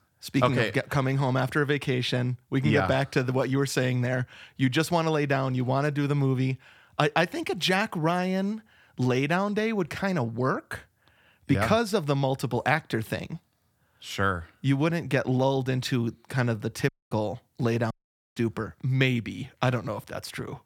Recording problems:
audio cutting out; at 17 s and at 18 s

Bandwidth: 18.5 kHz